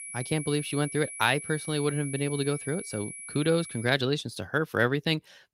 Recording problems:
high-pitched whine; loud; until 4 s; 10.5 kHz, 10 dB below the speech

